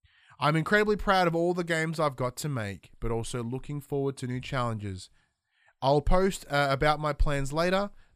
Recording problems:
none

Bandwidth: 15 kHz